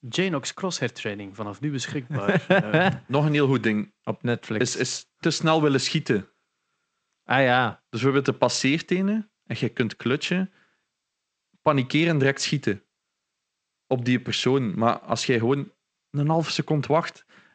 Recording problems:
garbled, watery; slightly; nothing above 8 kHz

